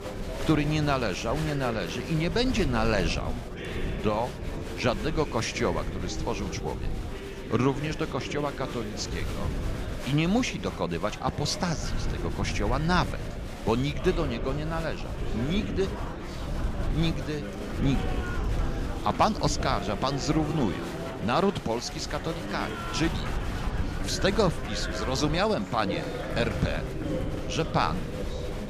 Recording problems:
murmuring crowd; loud; throughout; 8 dB below the speech
wind noise on the microphone; occasional gusts; 20 dB below the speech

